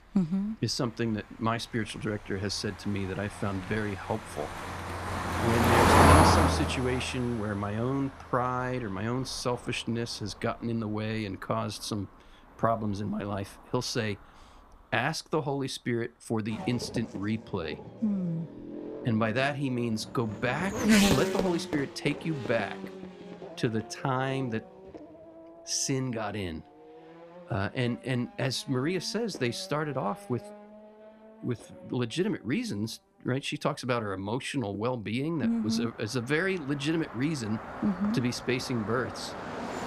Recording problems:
traffic noise; very loud; throughout; 2 dB above the speech

